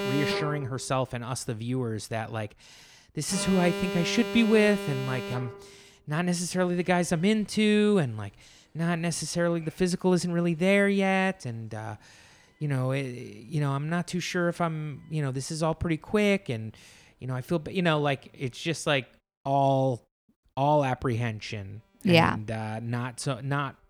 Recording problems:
alarms or sirens; loud; throughout; 6 dB below the speech

